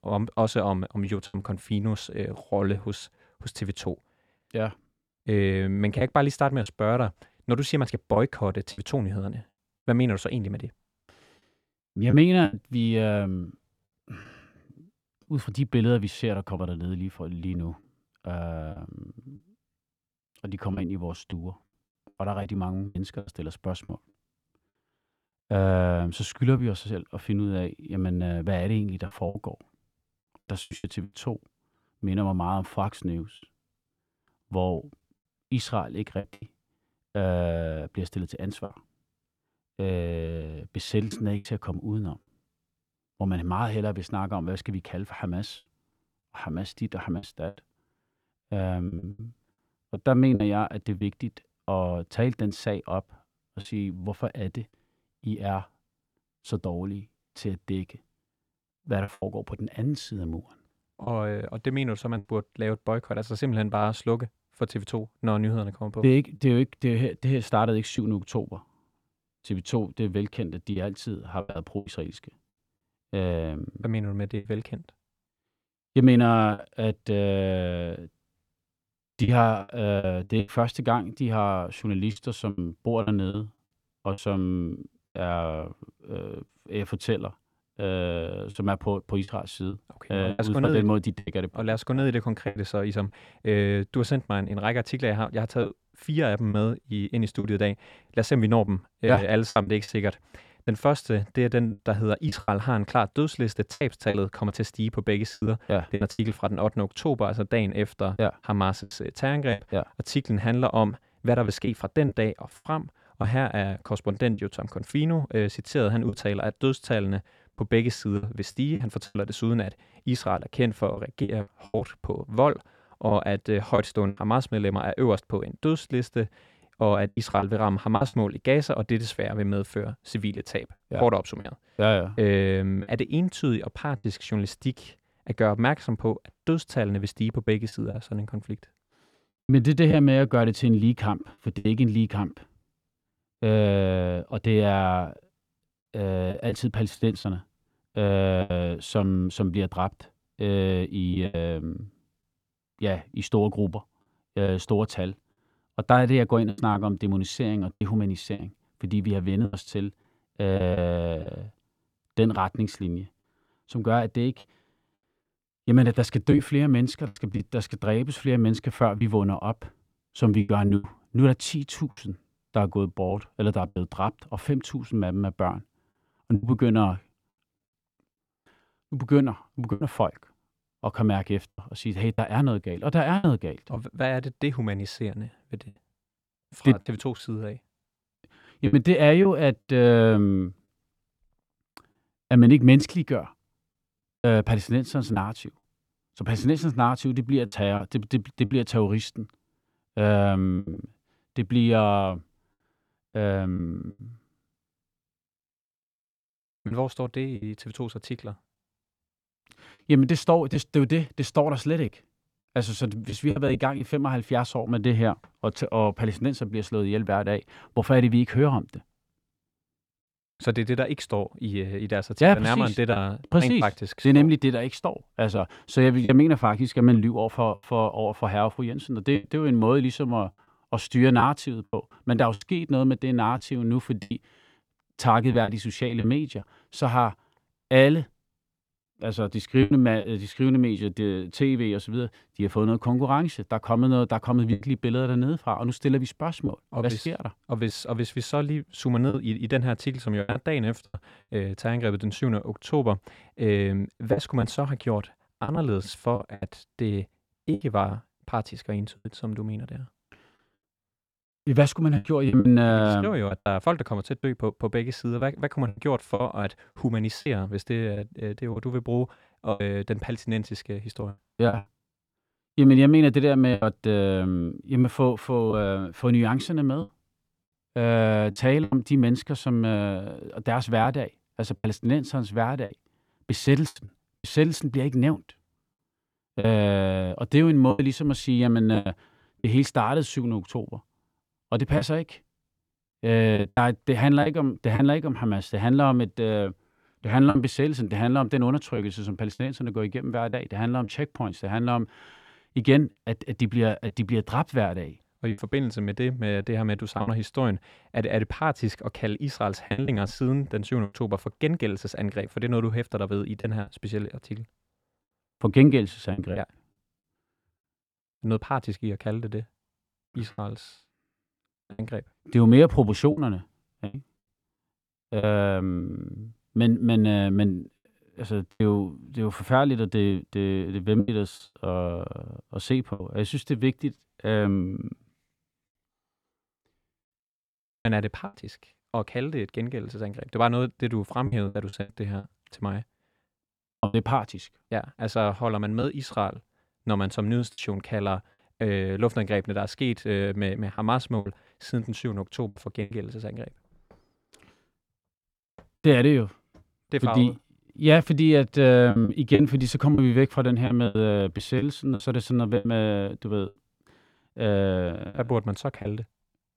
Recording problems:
choppy; very; 5% of the speech affected

